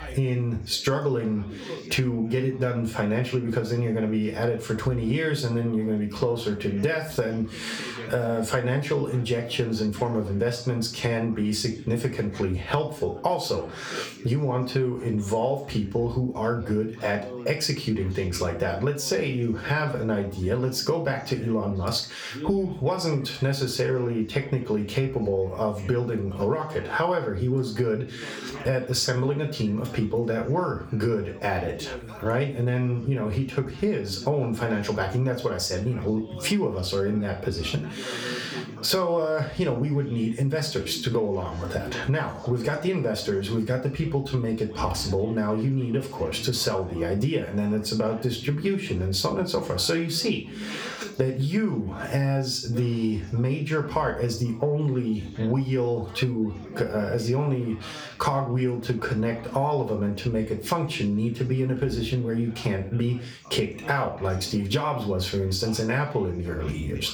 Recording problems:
off-mic speech; far
room echo; slight; dies away in 0.3 s
squashed, flat; somewhat, background pumping
background chatter; noticeable; throughout; 3 voices, 20 dB below the speech

